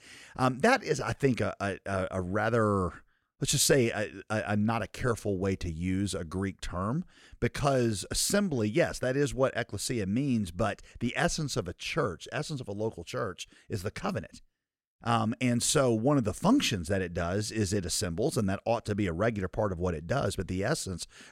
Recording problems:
none

